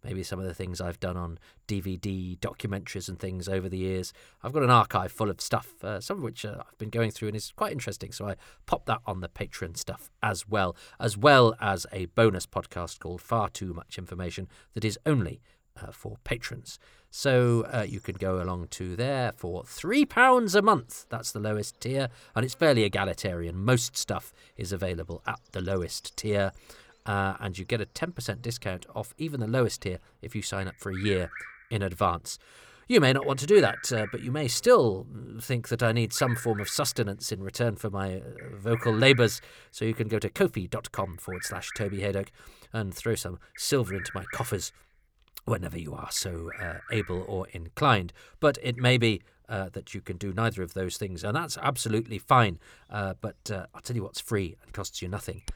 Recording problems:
animal sounds; noticeable; throughout; 15 dB below the speech

